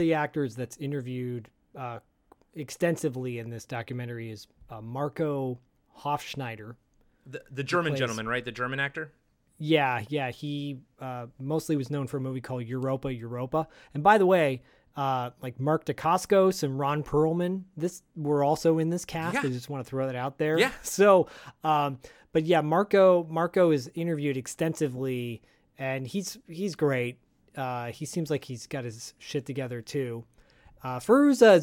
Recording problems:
abrupt cut into speech; at the start and the end

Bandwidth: 17 kHz